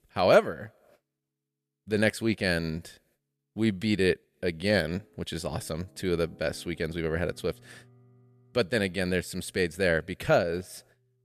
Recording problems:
background music; faint; throughout; 30 dB below the speech

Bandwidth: 14.5 kHz